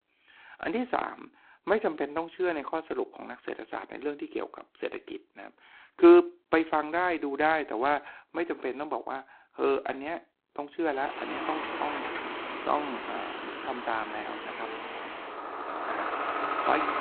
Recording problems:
phone-call audio; poor line; nothing above 4 kHz
traffic noise; loud; from 11 s on; 5 dB below the speech

